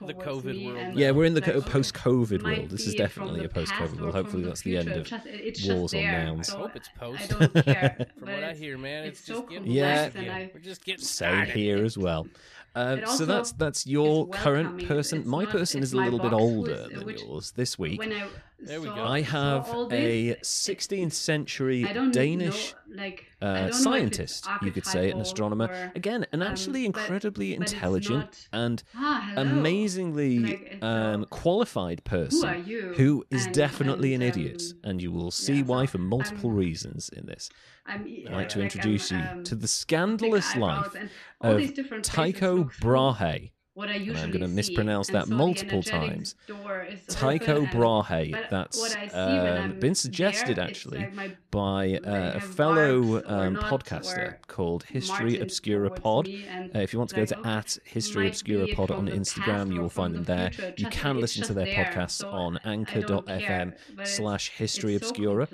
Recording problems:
voice in the background; loud; throughout; 7 dB below the speech

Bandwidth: 13.5 kHz